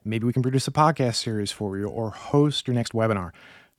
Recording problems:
uneven, jittery; strongly

